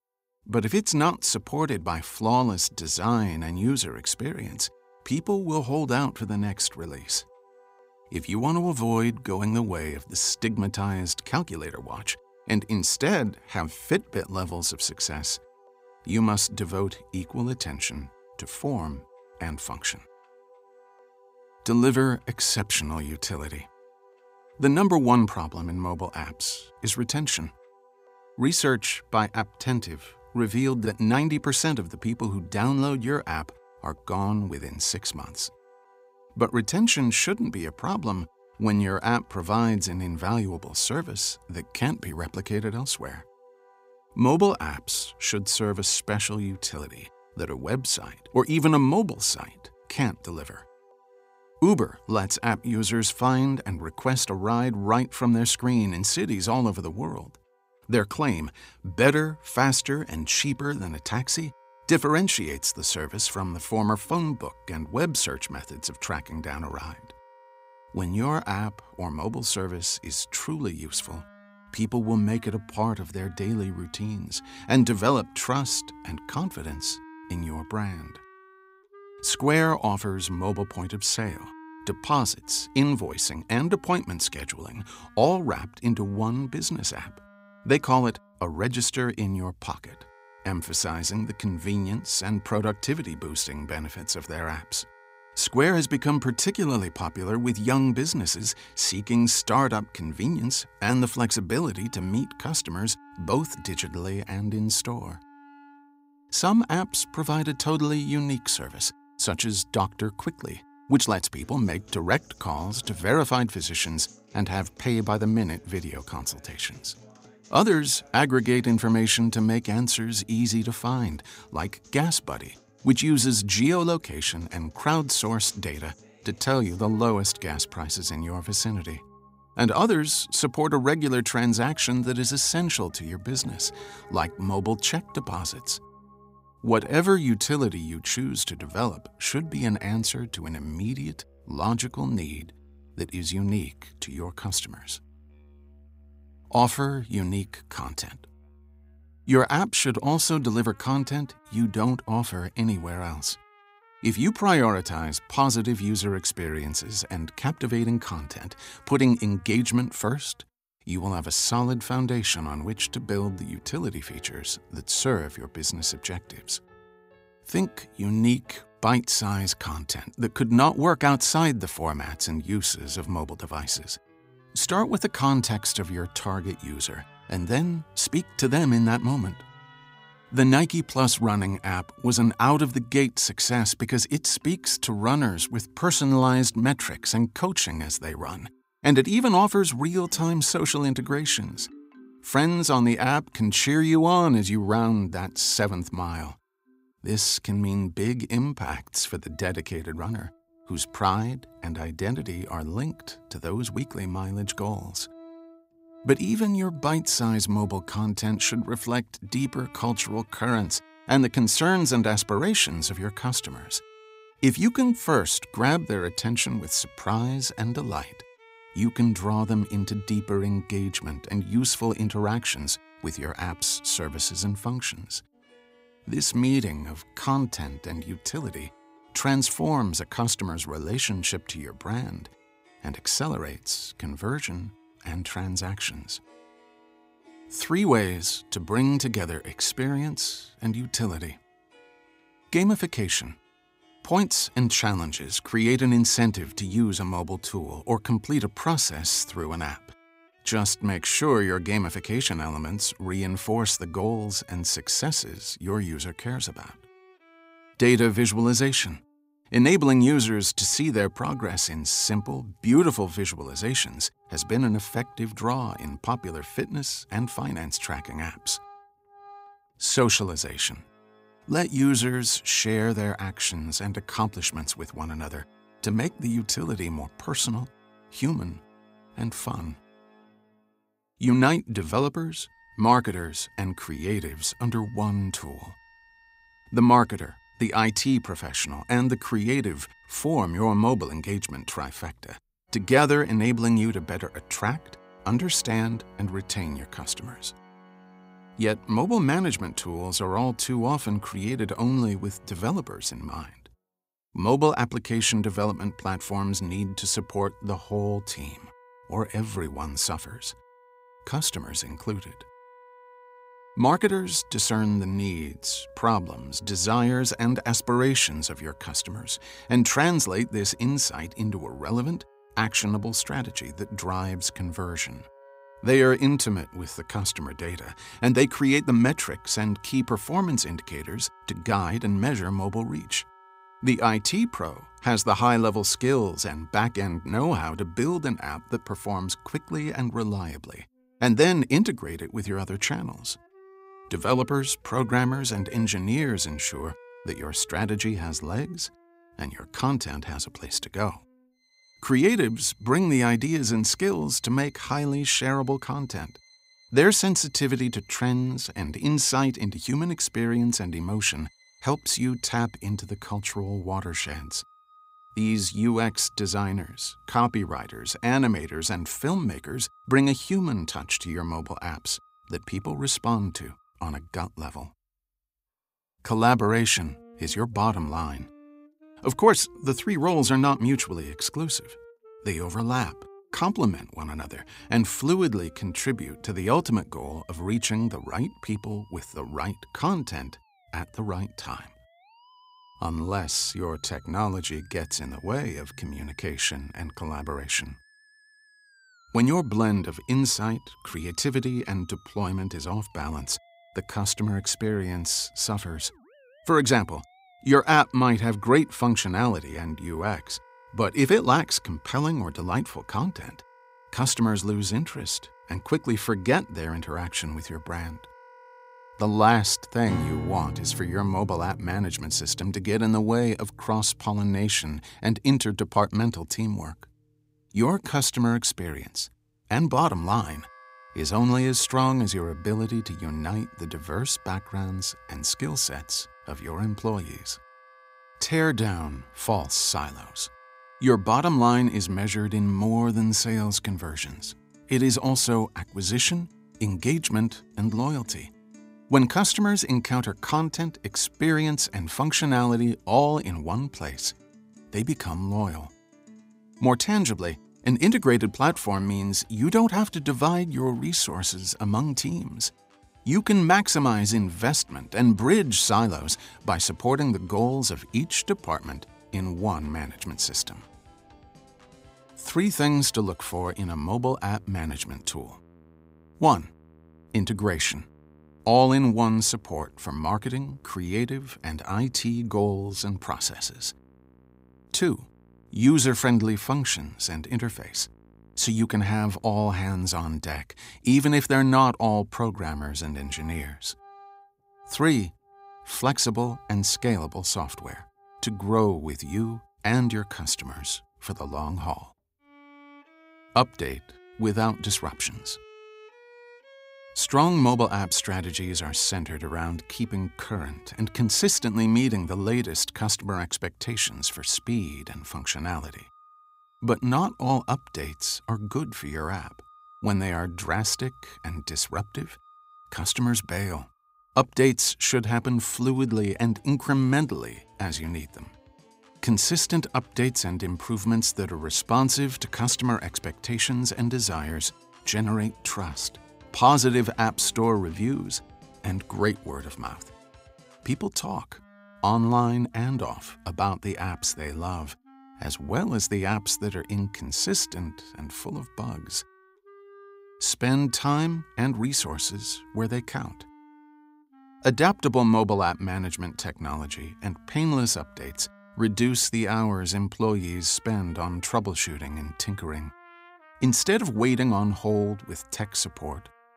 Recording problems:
background music; faint; throughout; 25 dB below the speech

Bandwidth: 15.5 kHz